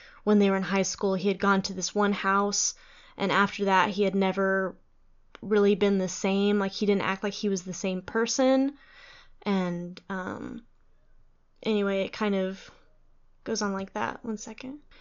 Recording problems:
high frequencies cut off; noticeable; nothing above 7 kHz

